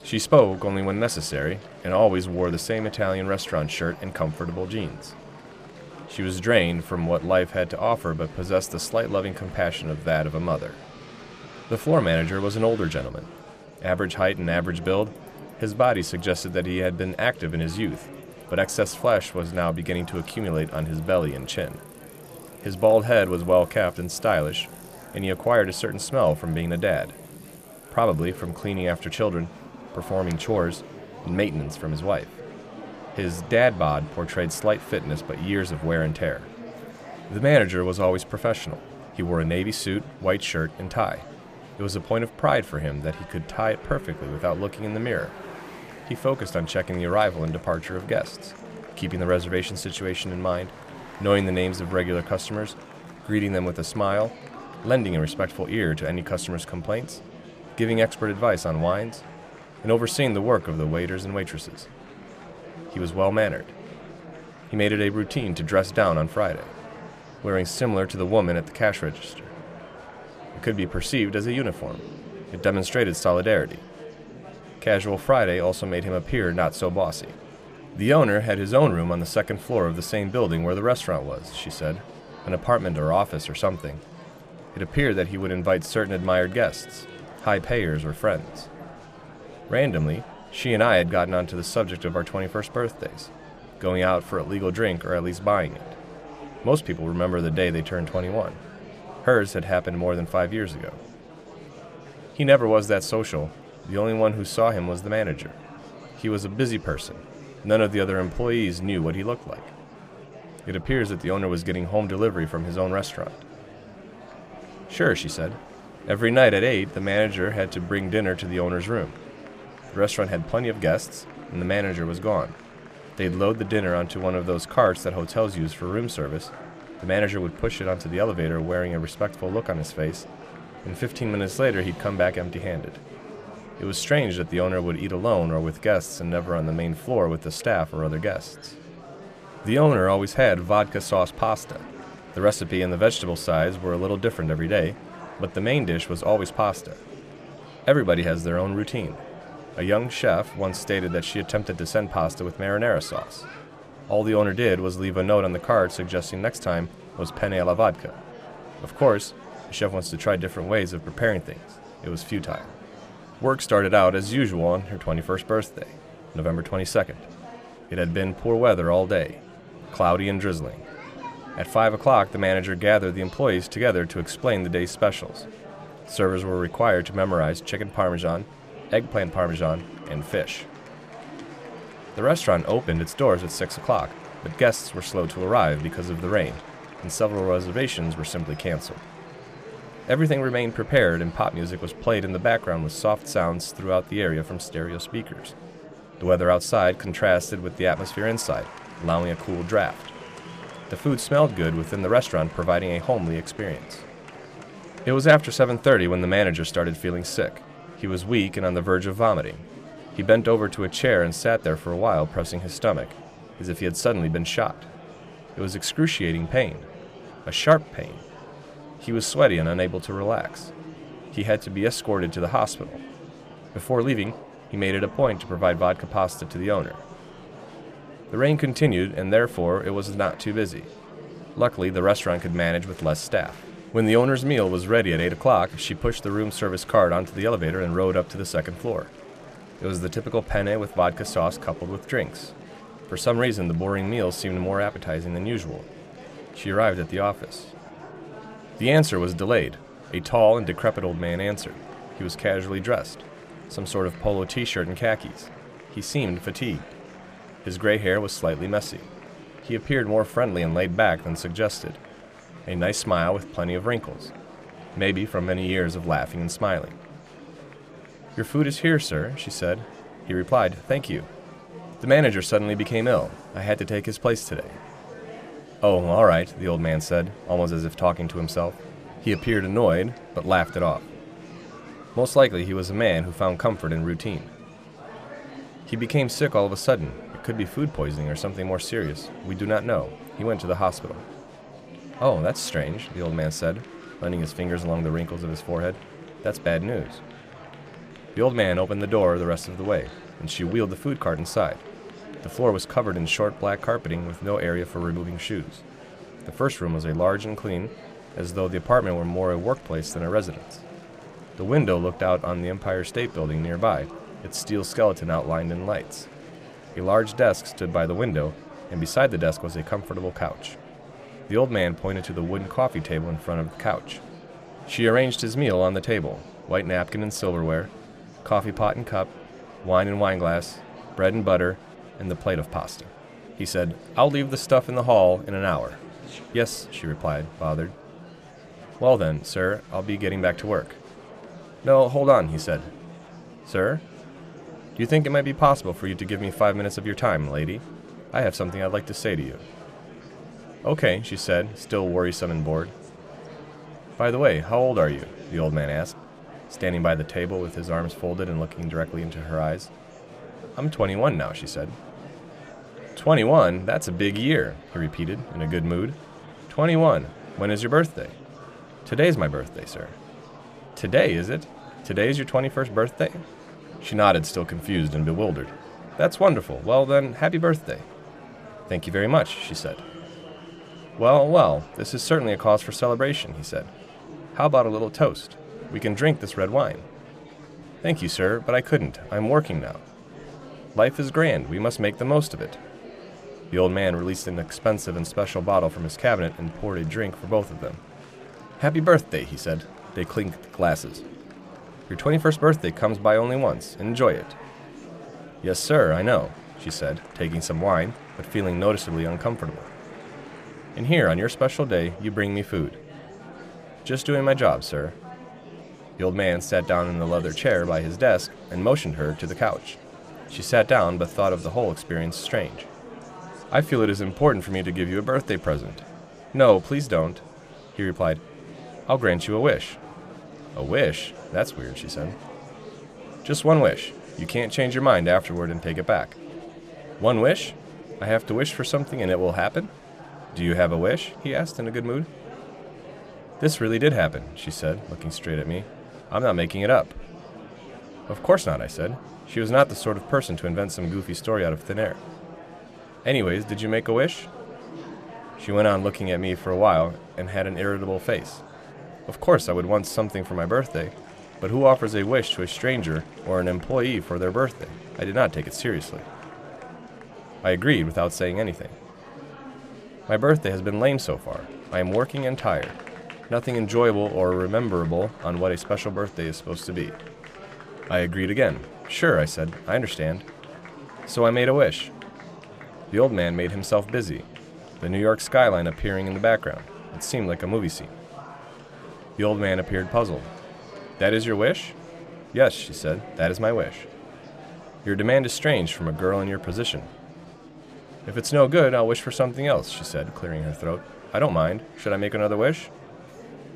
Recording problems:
murmuring crowd; noticeable; throughout; 20 dB below the speech
traffic noise; faint; throughout; 30 dB below the speech

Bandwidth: 14.5 kHz